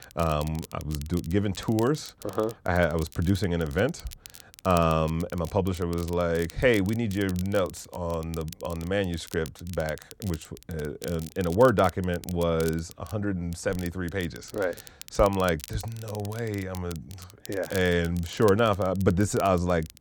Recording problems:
crackle, like an old record; noticeable; 20 dB below the speech

